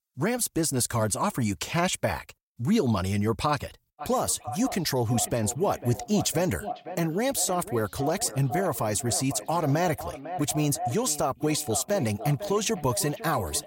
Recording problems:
echo of what is said; strong; from 4 s on; 500 ms later, 10 dB below the speech

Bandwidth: 16.5 kHz